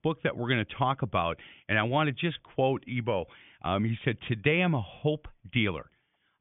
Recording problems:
high frequencies cut off; severe; nothing above 3.5 kHz

